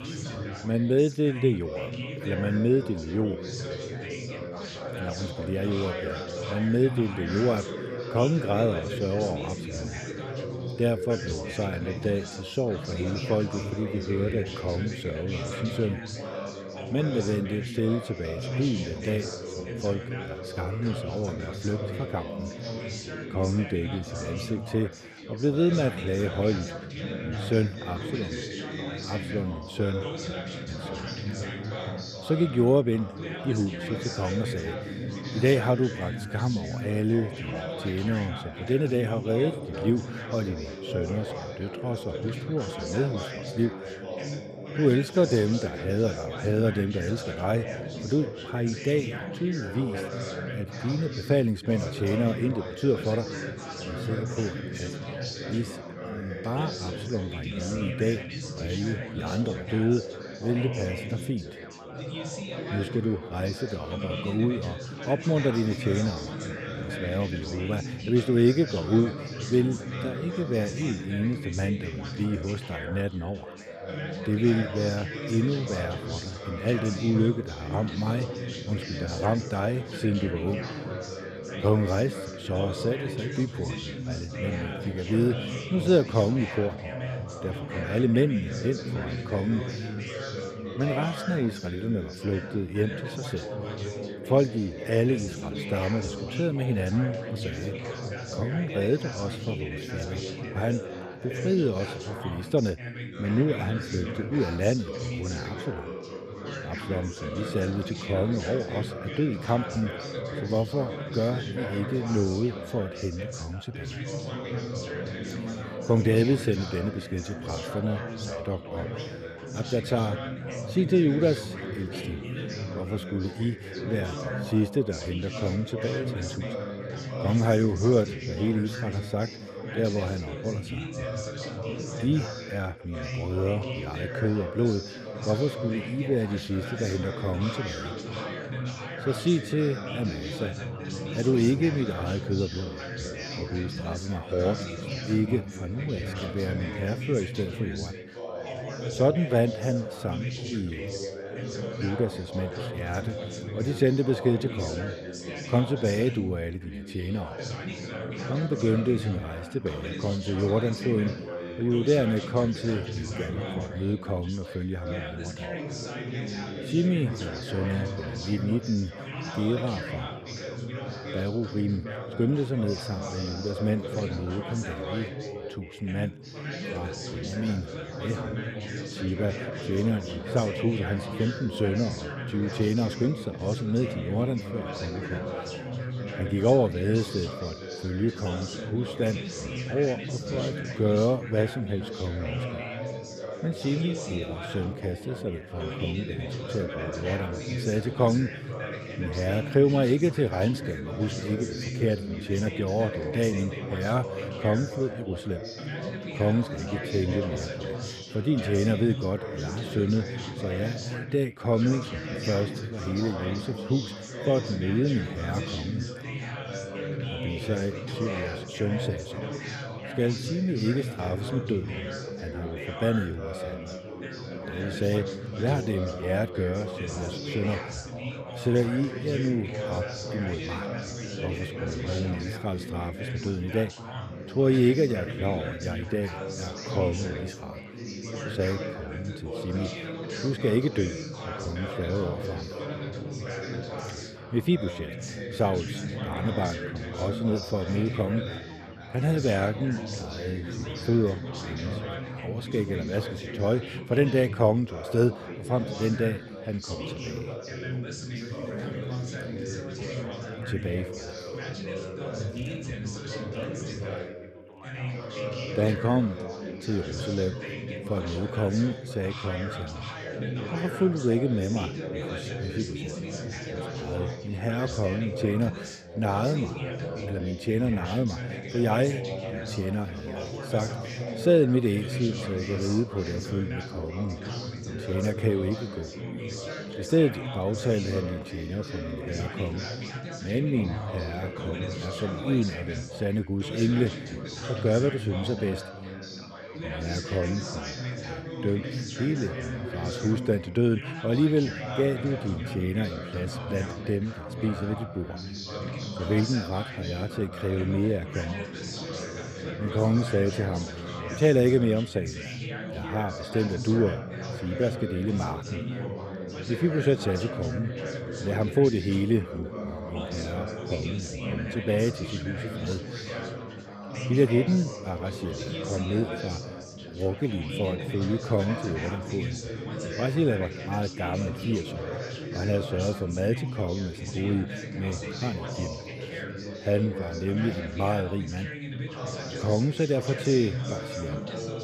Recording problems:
background chatter; loud; throughout; 4 voices, 6 dB below the speech

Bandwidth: 14.5 kHz